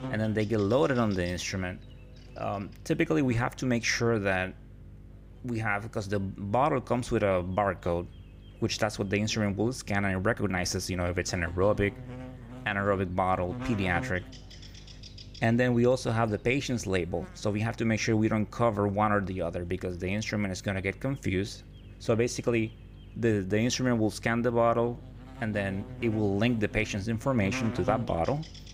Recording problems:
electrical hum; noticeable; throughout; 50 Hz, 20 dB below the speech

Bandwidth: 15.5 kHz